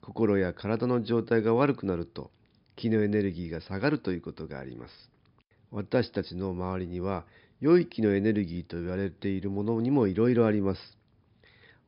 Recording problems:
high frequencies cut off; noticeable; nothing above 5.5 kHz

